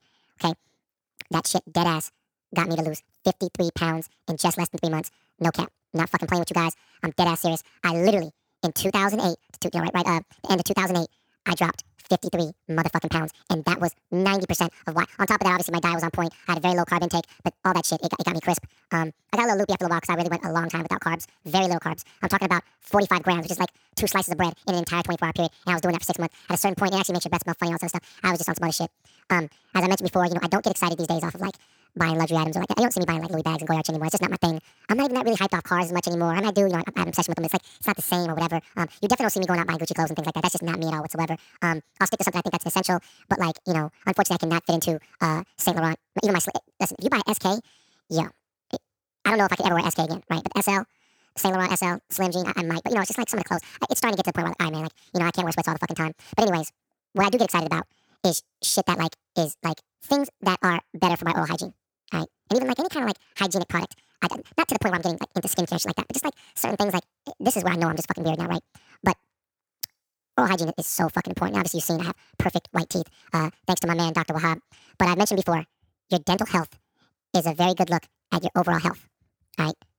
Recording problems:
wrong speed and pitch; too fast and too high; 1.7 times normal speed

